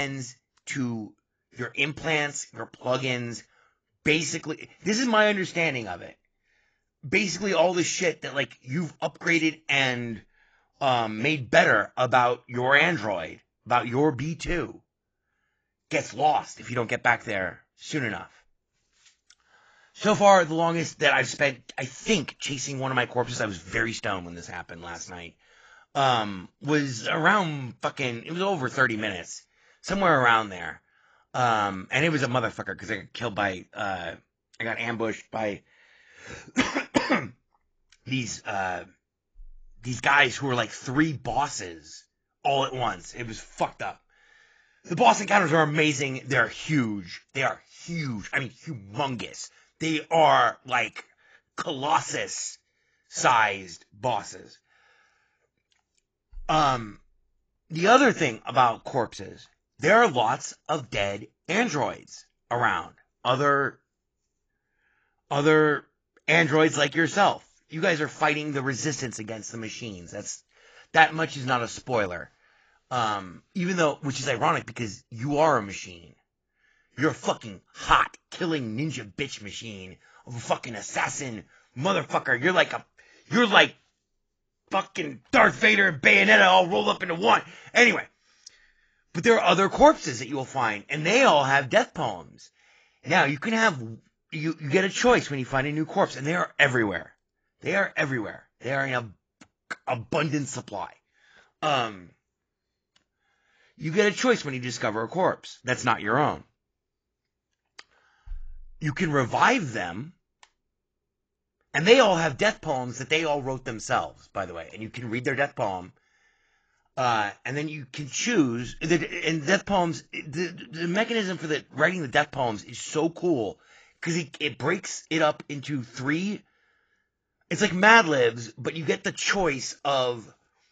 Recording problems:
garbled, watery; badly; nothing above 7.5 kHz
abrupt cut into speech; at the start

